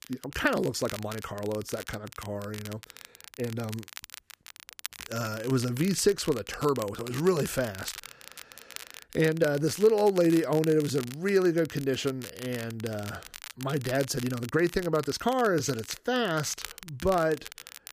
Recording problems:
crackle, like an old record; noticeable; 15 dB below the speech
uneven, jittery; strongly; from 1 to 17 s

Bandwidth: 15 kHz